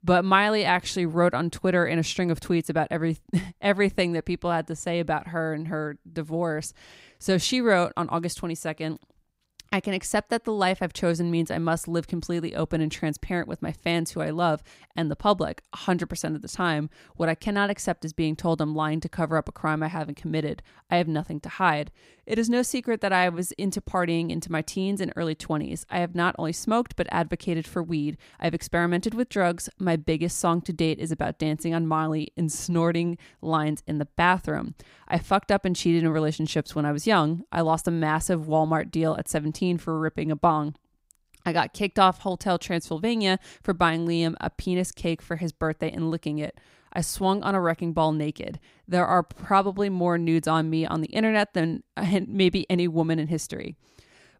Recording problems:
none

